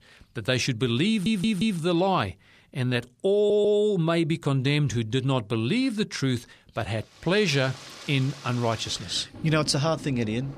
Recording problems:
rain or running water; noticeable; from 7.5 s on; 15 dB below the speech
audio stuttering; at 1 s and at 3.5 s

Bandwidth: 14 kHz